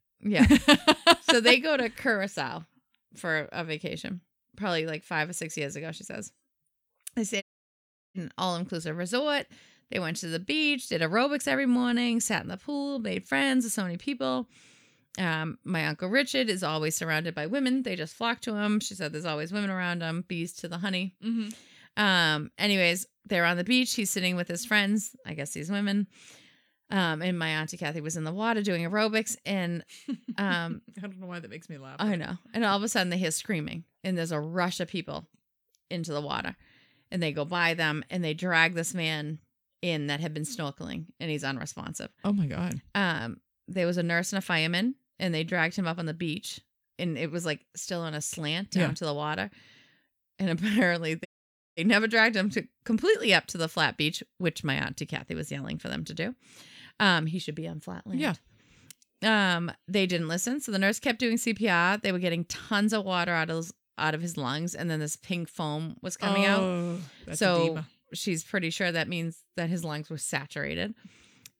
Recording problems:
audio cutting out; at 7.5 s for 0.5 s and at 51 s for 0.5 s

